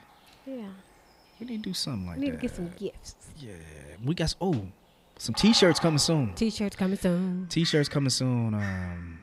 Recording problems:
animal sounds; noticeable; throughout; 15 dB below the speech

